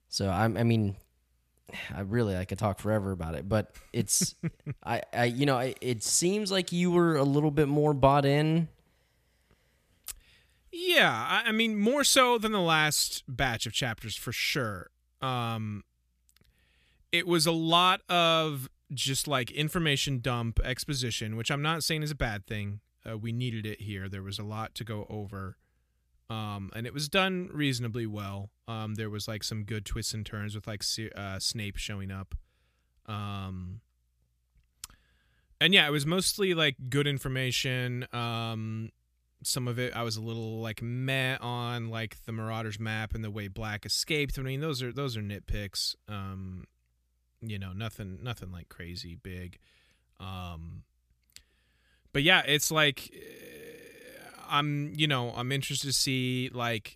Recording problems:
none

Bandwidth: 14.5 kHz